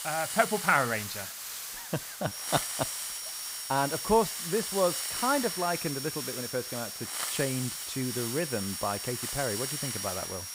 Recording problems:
high-pitched whine; loud; from 2 s on; 5.5 kHz, 8 dB below the speech
hiss; loud; throughout; 3 dB below the speech
choppy; very; at 1.5 s; 8% of the speech affected

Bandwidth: 15.5 kHz